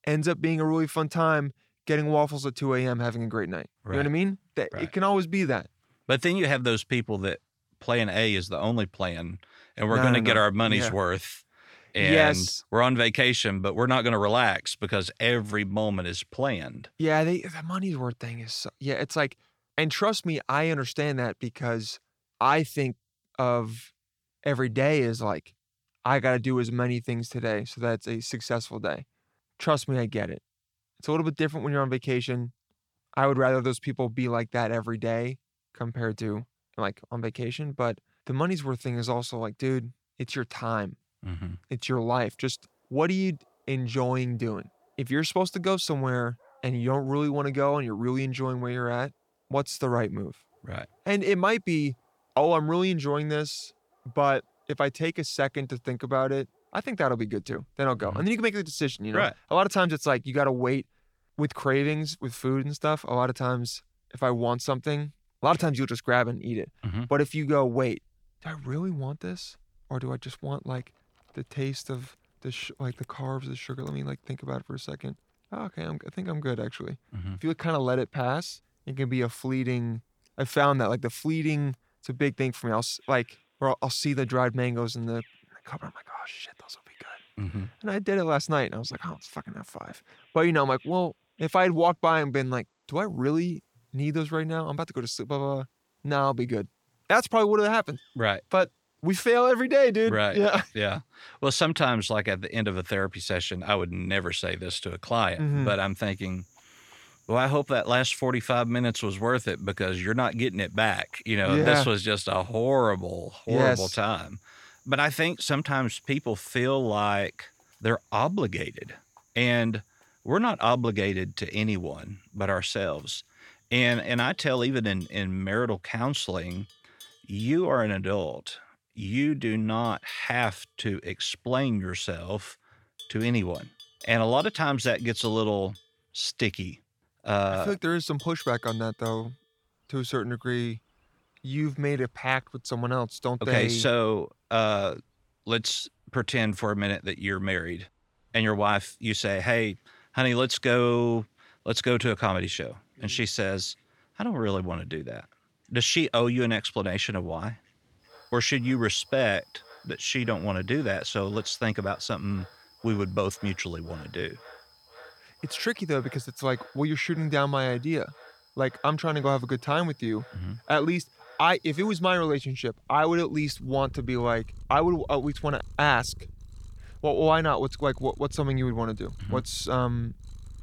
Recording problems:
animal sounds; faint; from 42 s on; 25 dB below the speech

